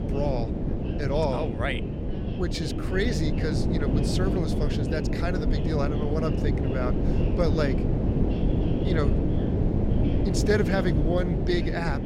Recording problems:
wind noise on the microphone; heavy; 3 dB below the speech
voice in the background; noticeable; throughout; 20 dB below the speech

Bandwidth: 16 kHz